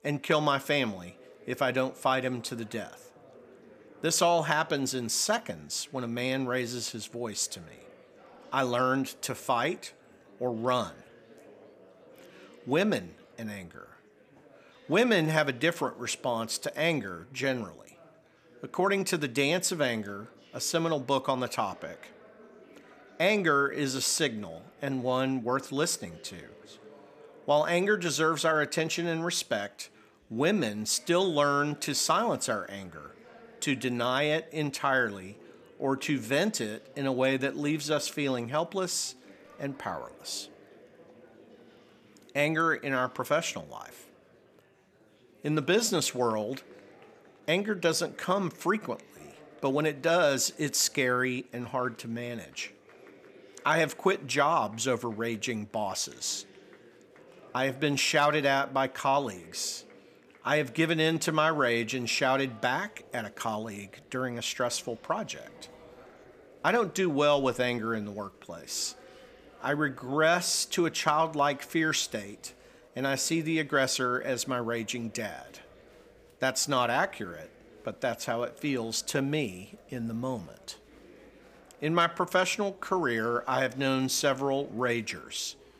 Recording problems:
murmuring crowd; faint; throughout; 25 dB below the speech

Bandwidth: 15 kHz